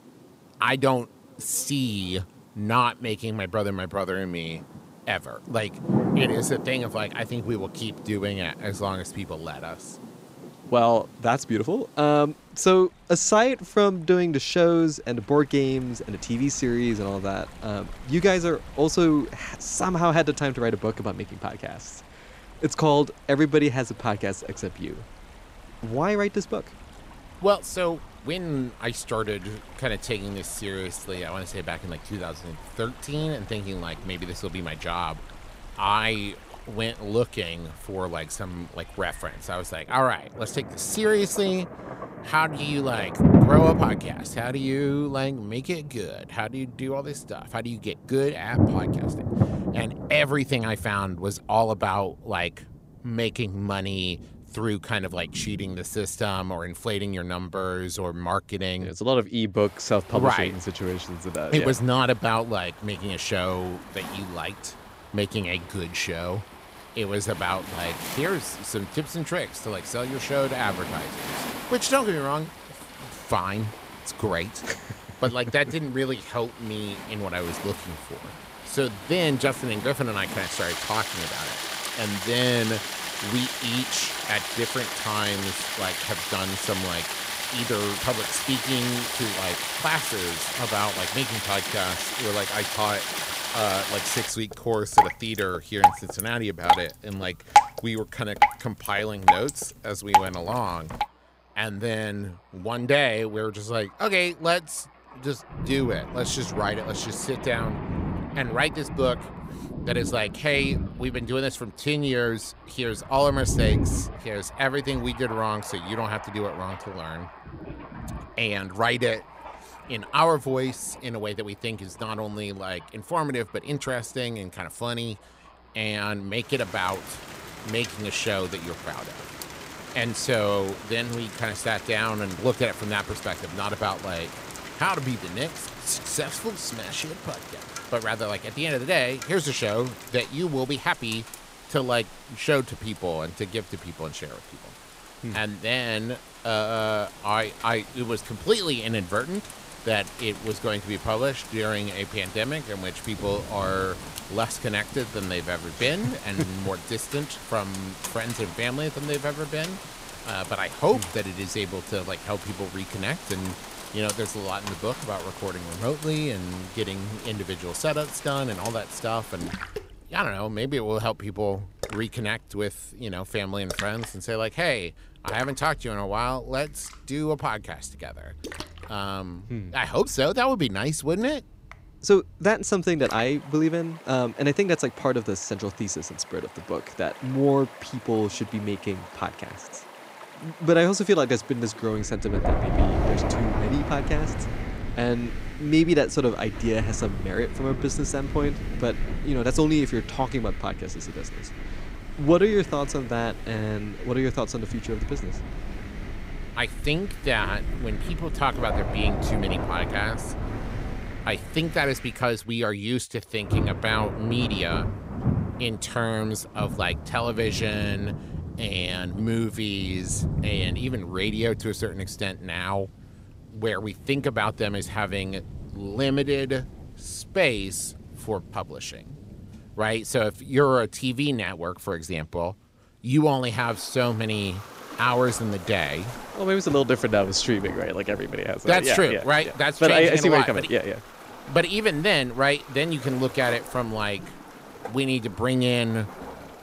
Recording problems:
rain or running water; loud; throughout; 5 dB below the speech

